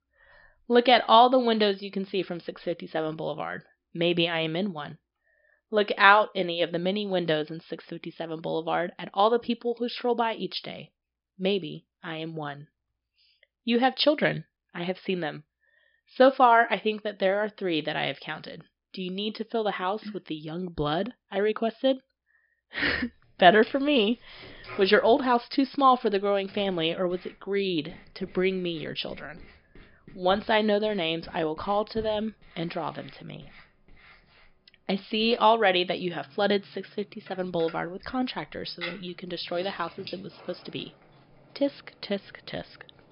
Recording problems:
high frequencies cut off; noticeable; nothing above 5.5 kHz
household noises; faint; from 23 s on; 20 dB below the speech

